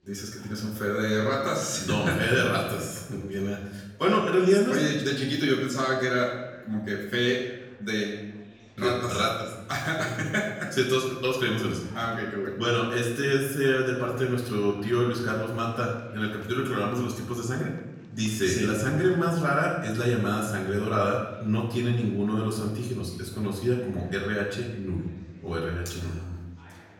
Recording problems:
off-mic speech; far
room echo; noticeable; dies away in 0.9 s
chatter from many people; faint; throughout; 25 dB below the speech

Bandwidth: 17.5 kHz